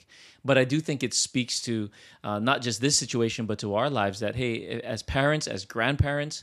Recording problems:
none

